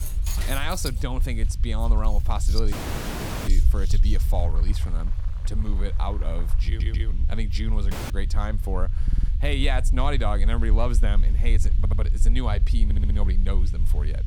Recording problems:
household noises; loud; until 6.5 s; 9 dB below the speech
low rumble; noticeable; throughout; 15 dB below the speech
hiss; faint; throughout; 25 dB below the speech
door banging; noticeable; until 1 s; peak 4 dB below the speech
audio cutting out; at 2.5 s for 1 s and at 8 s
audio stuttering; 4 times, first at 6.5 s

